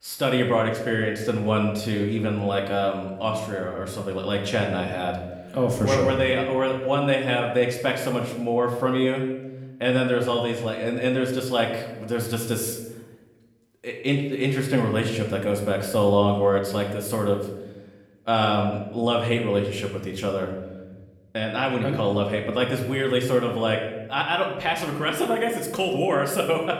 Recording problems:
room echo; slight; dies away in 0.9 s
off-mic speech; somewhat distant

